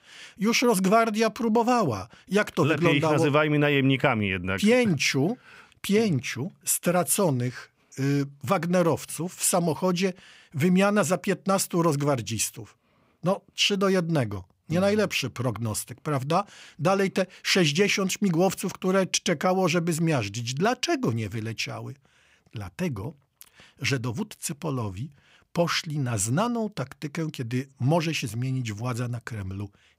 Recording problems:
none

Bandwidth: 15.5 kHz